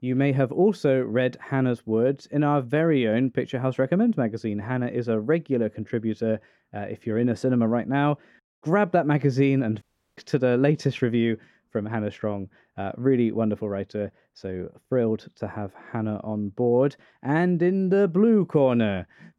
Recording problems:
muffled; slightly; fading above 1.5 kHz
audio cutting out; at 10 s

